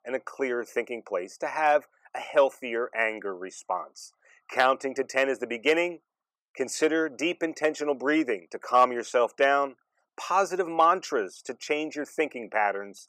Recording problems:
thin; somewhat; fading below 450 Hz

